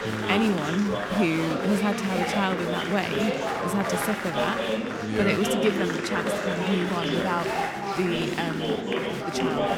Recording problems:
chatter from many people; loud; throughout; as loud as the speech

